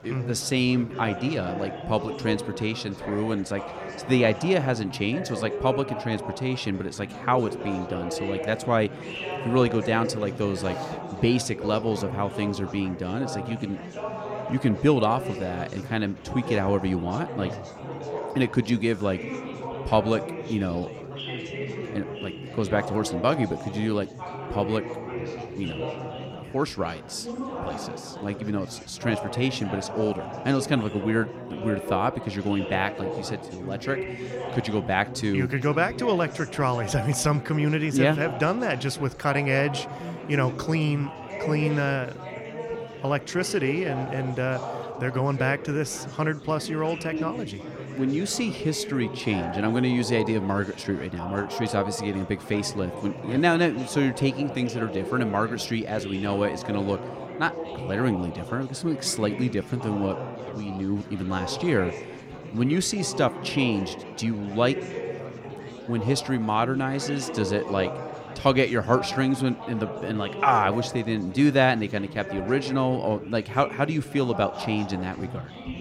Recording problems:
chatter from many people; loud; throughout; 9 dB below the speech

